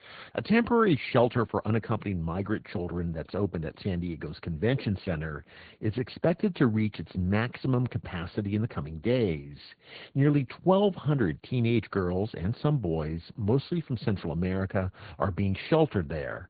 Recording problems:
high frequencies cut off; severe; nothing above 4.5 kHz
garbled, watery; slightly

